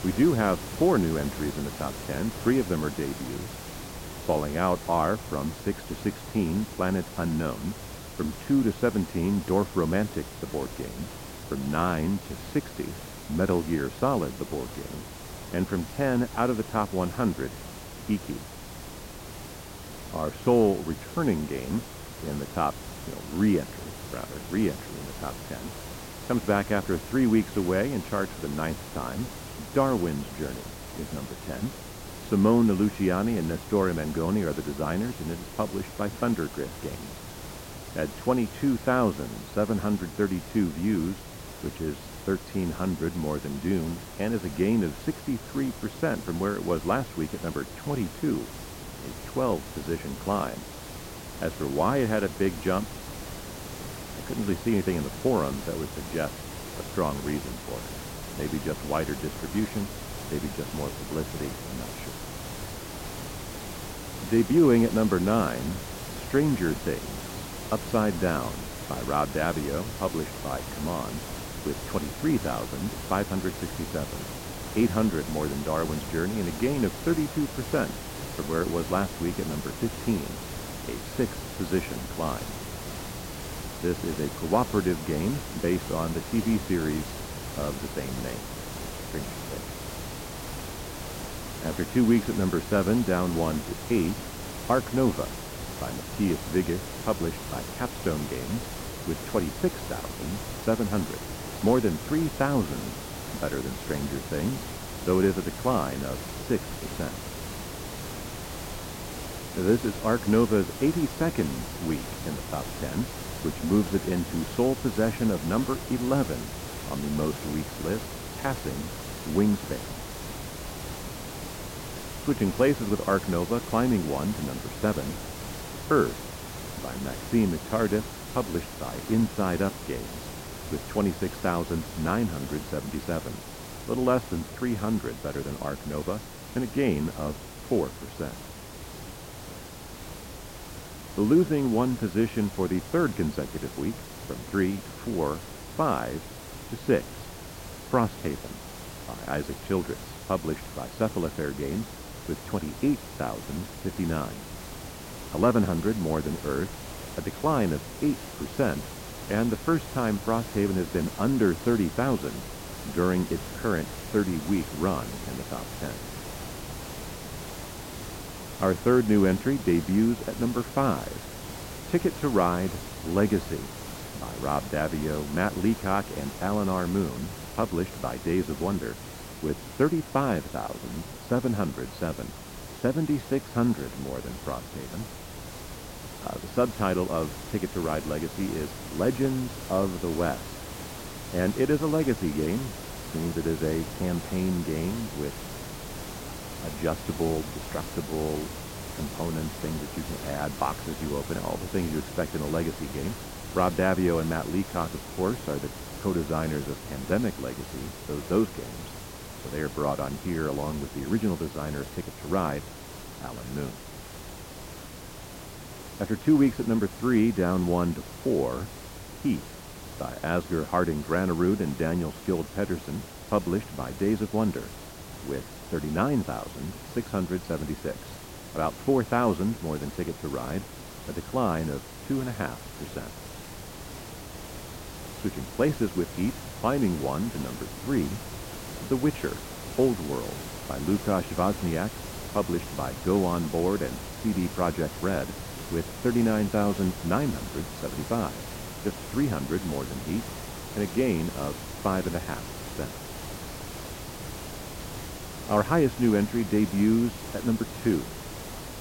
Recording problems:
muffled; very; fading above 1.5 kHz
hiss; loud; throughout; 10 dB below the speech

